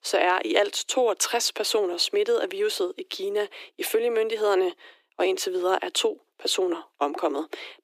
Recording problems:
thin; very; fading below 300 Hz

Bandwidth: 15 kHz